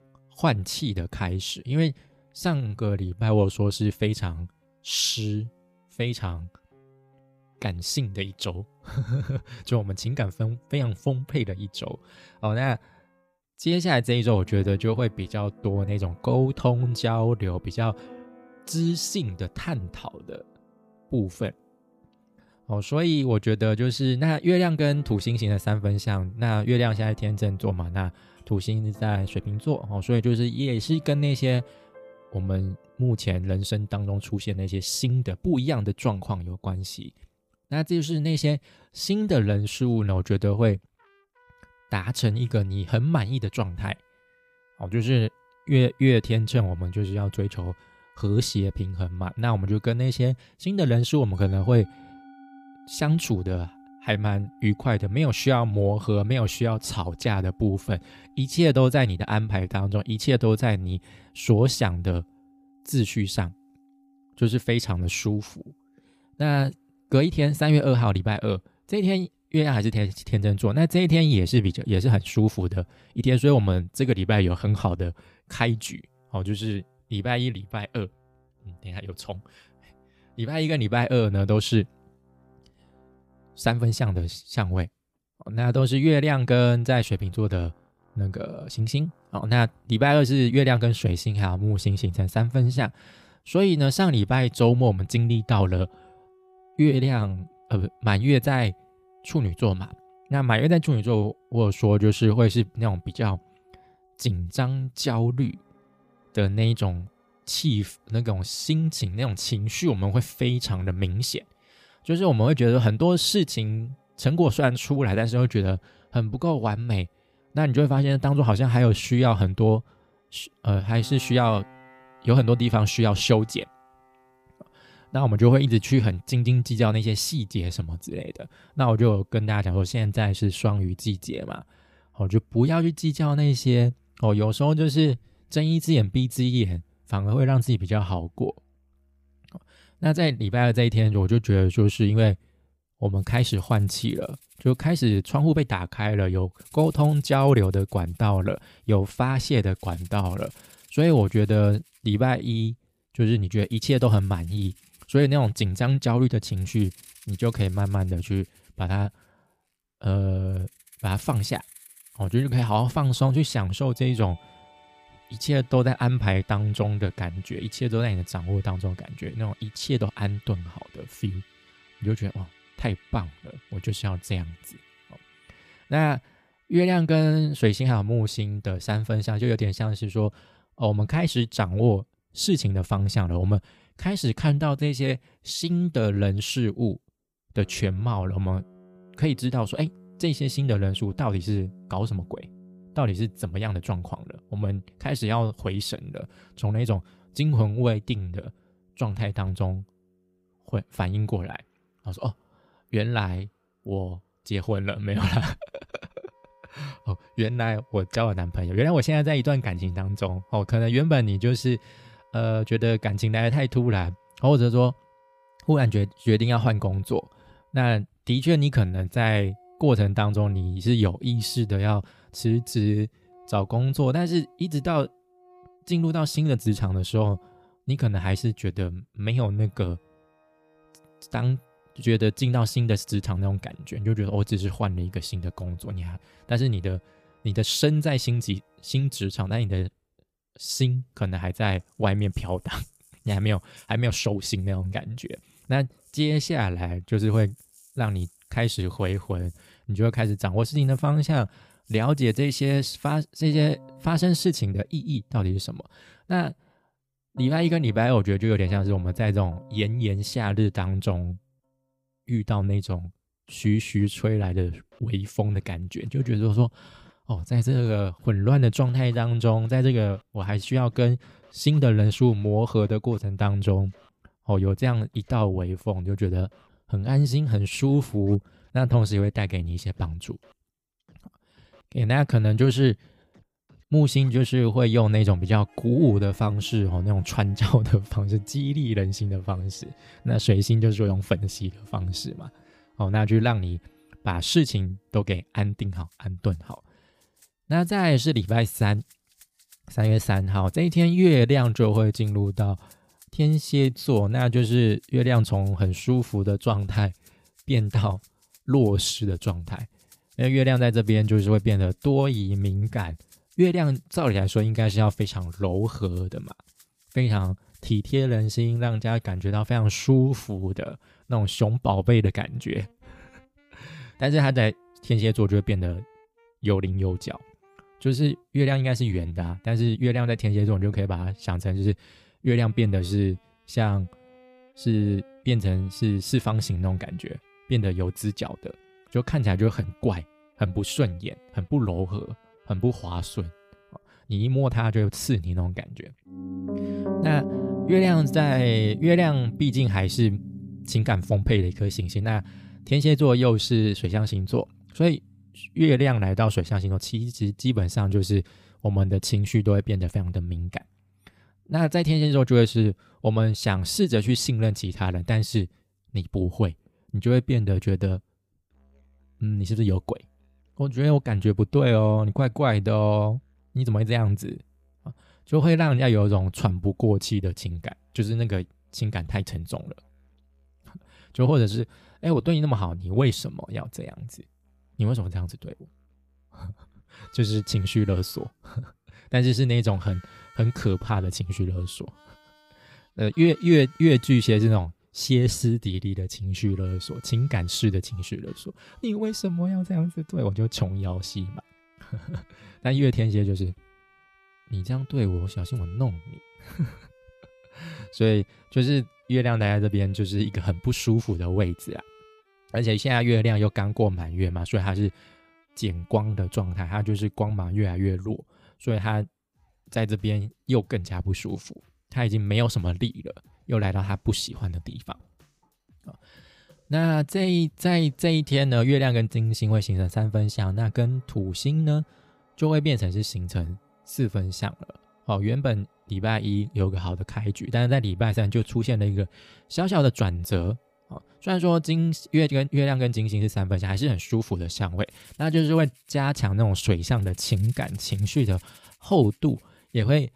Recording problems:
background music; faint; throughout; 25 dB below the speech

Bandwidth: 15 kHz